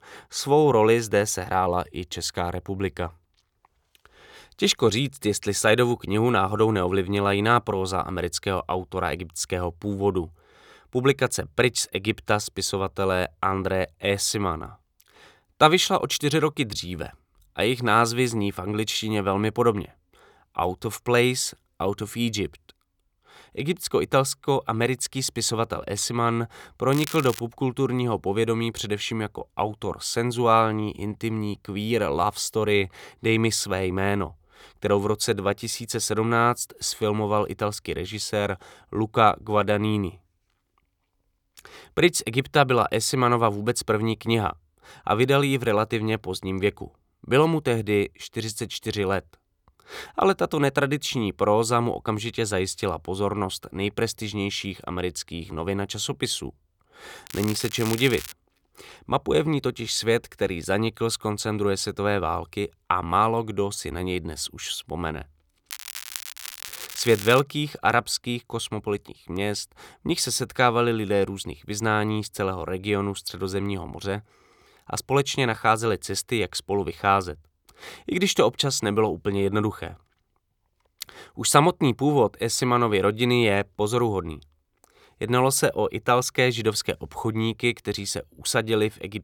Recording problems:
crackling; noticeable; at 27 s, from 57 to 58 s and from 1:06 to 1:07; 10 dB below the speech

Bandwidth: 18.5 kHz